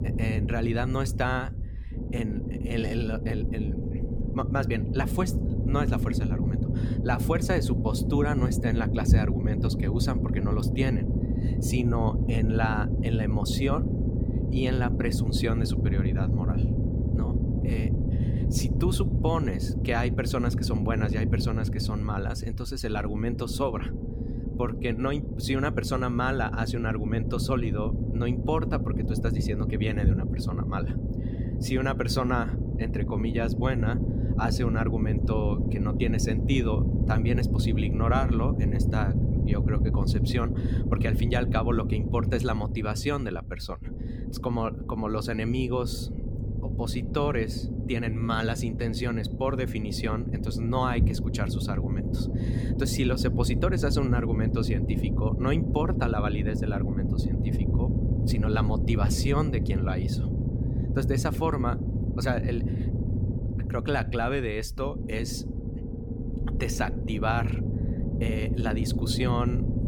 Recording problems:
low rumble; loud; throughout; 5 dB below the speech

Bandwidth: 18 kHz